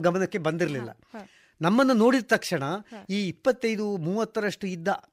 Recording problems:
abrupt cut into speech; at the start

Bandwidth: 15.5 kHz